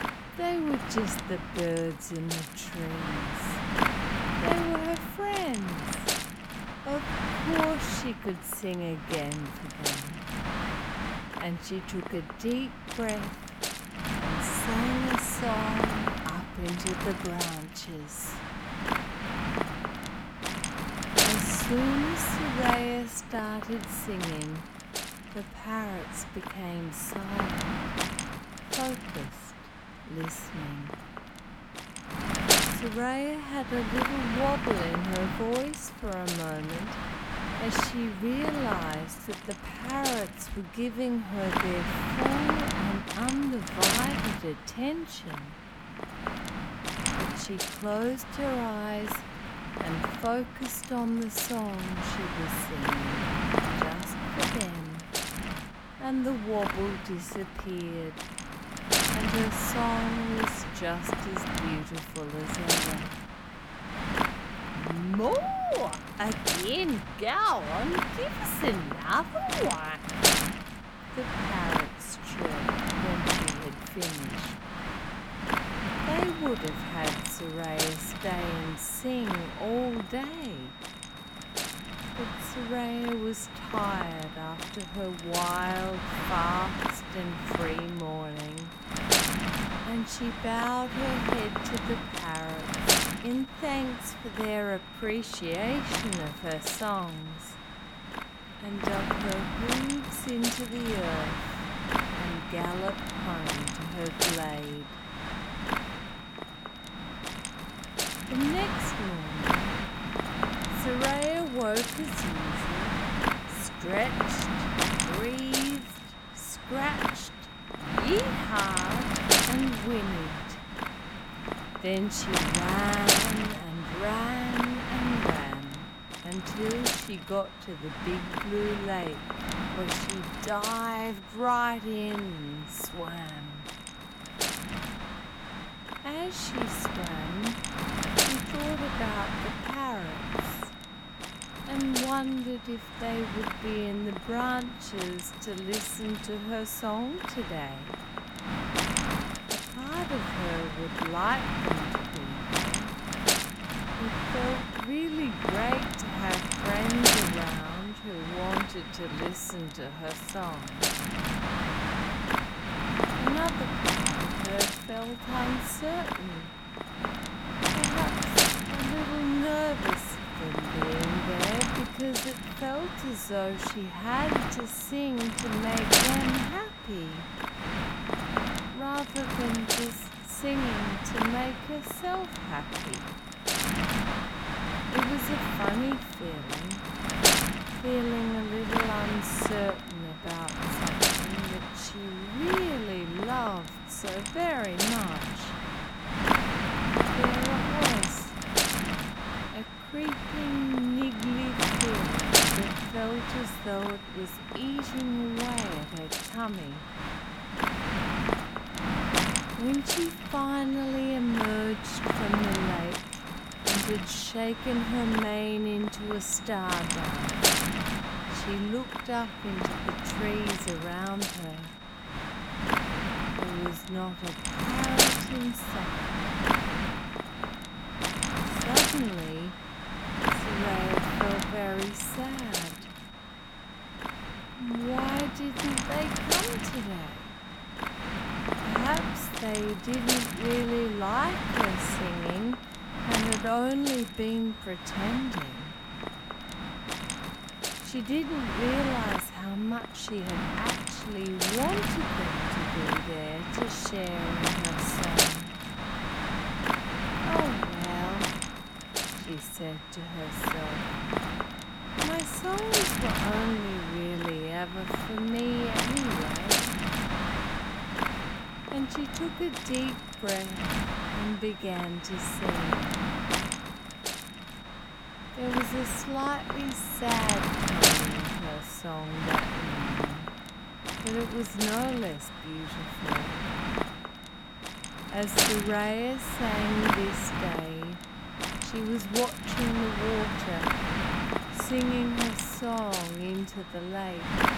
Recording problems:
wrong speed, natural pitch; too slow; 0.5 times normal speed
wind noise on the microphone; heavy; 3 dB above the speech
high-pitched whine; noticeable; from 1:16 on; 3.5 kHz, 15 dB below the speech

